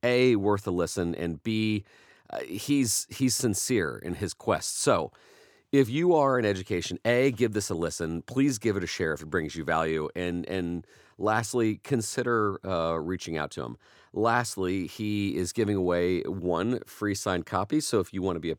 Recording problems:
none

